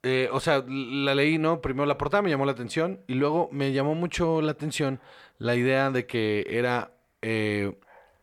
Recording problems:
none

